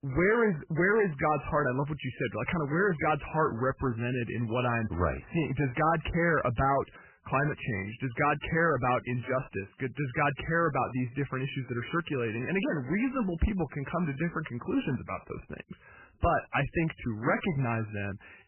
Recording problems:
garbled, watery; badly; nothing above 3 kHz
distortion; slight; 6% of the sound clipped

